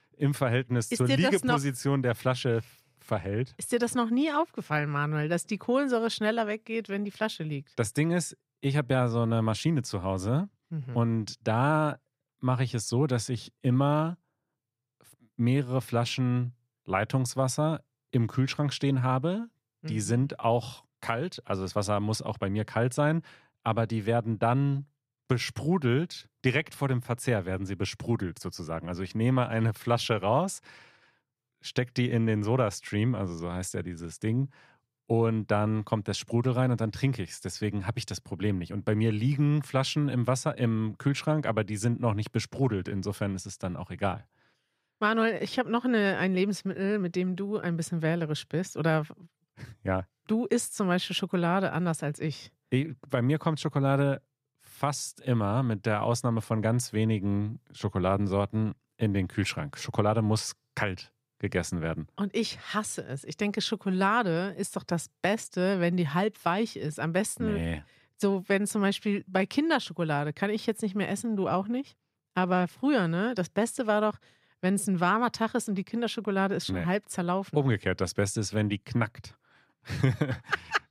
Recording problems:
none

